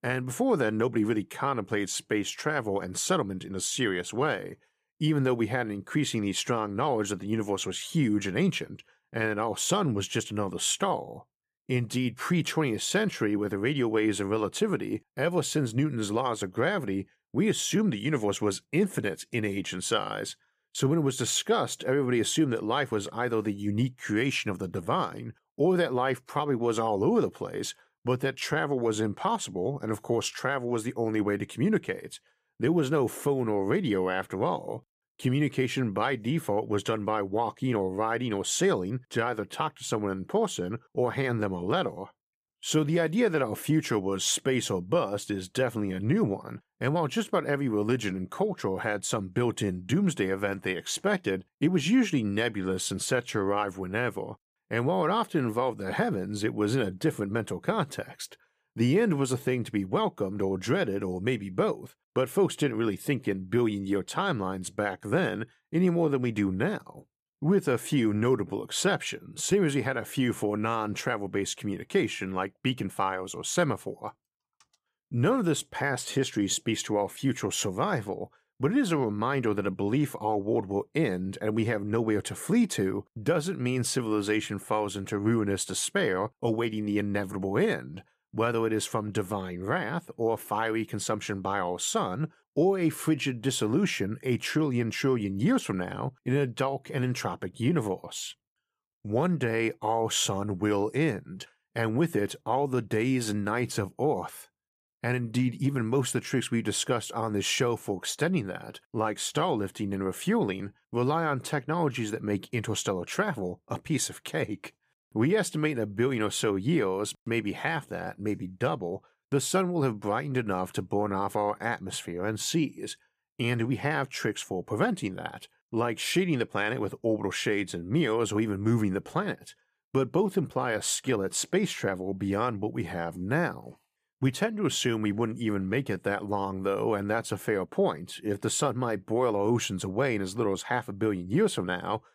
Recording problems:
none

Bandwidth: 15 kHz